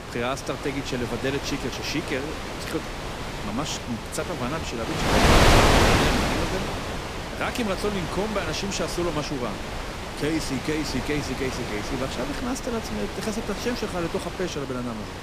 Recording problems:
wind noise on the microphone; heavy; 3 dB above the speech

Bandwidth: 15 kHz